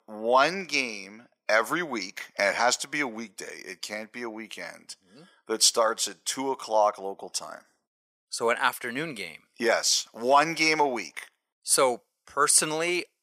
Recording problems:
thin; very; fading below 600 Hz

